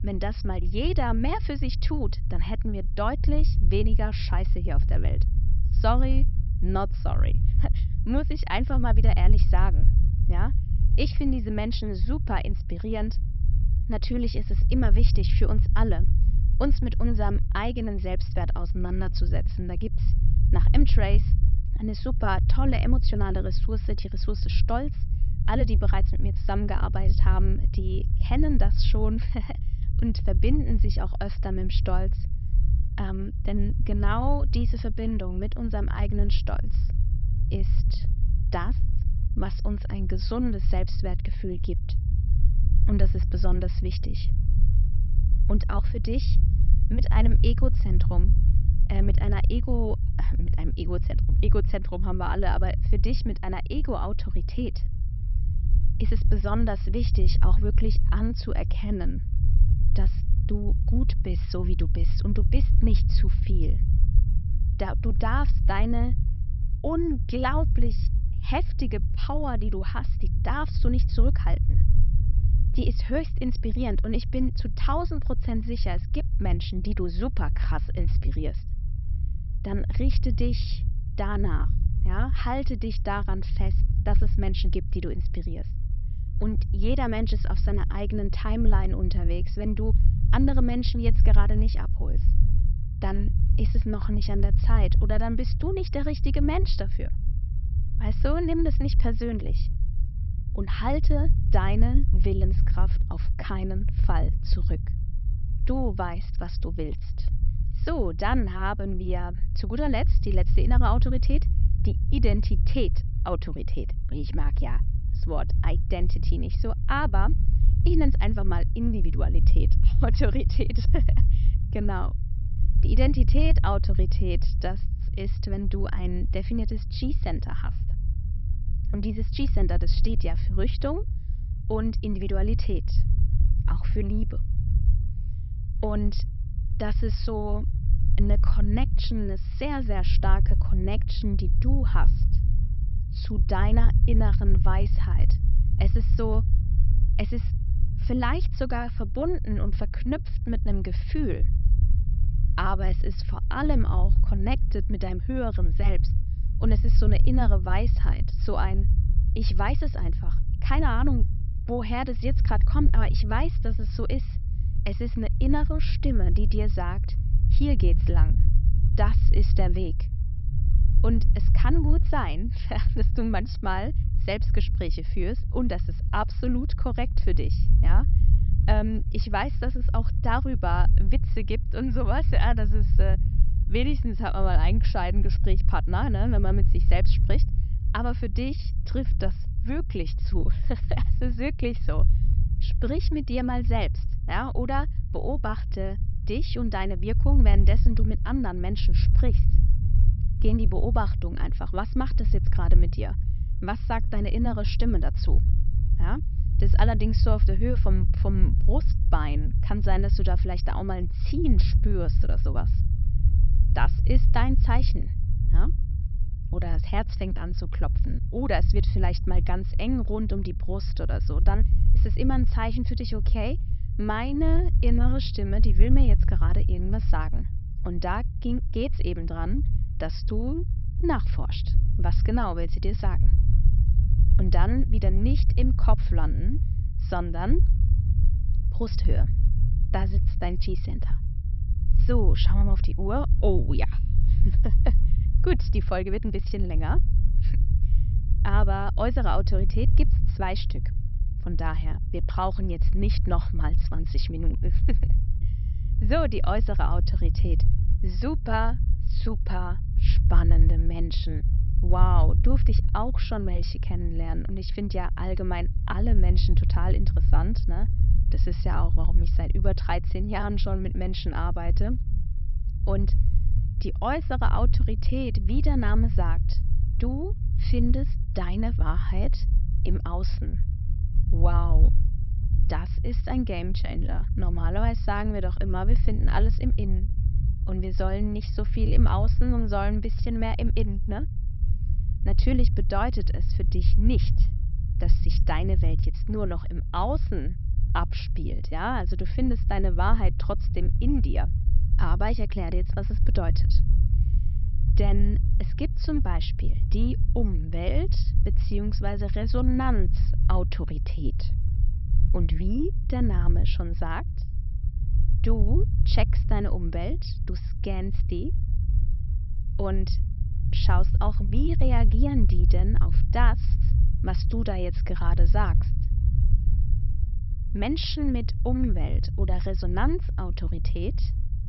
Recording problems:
high frequencies cut off; noticeable; nothing above 5.5 kHz
low rumble; noticeable; throughout; 10 dB below the speech

